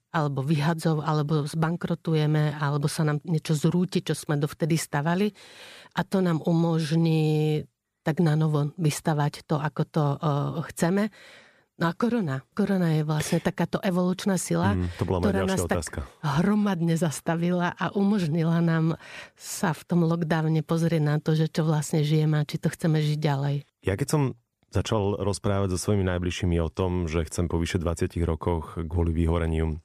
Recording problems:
none

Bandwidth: 14.5 kHz